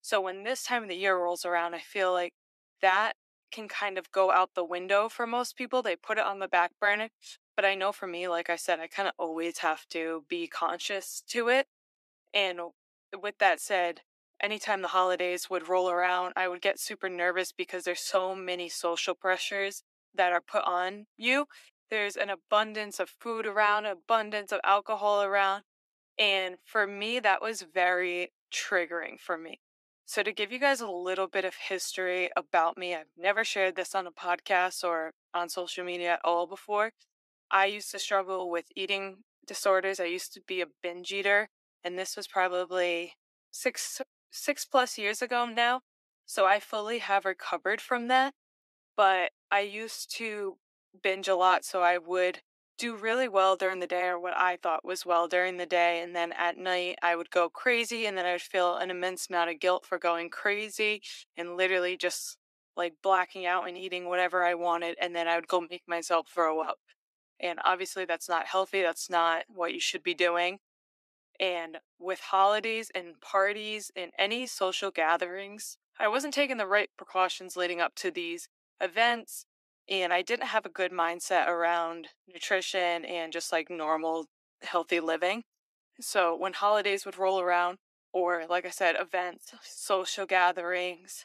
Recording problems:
thin; very; fading below 300 Hz

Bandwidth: 14 kHz